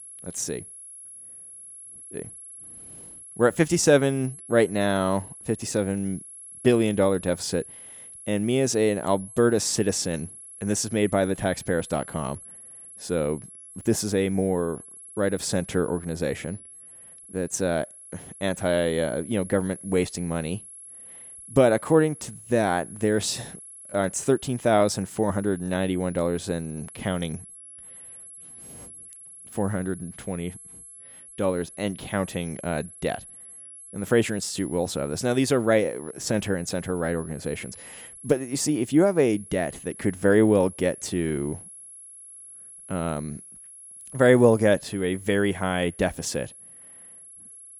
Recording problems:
high-pitched whine; noticeable; throughout; 11 kHz, 15 dB below the speech

